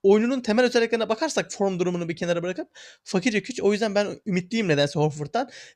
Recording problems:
none

